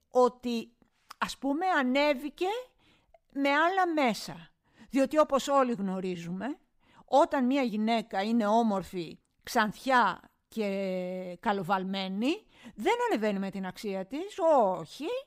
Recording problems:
none

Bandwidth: 15.5 kHz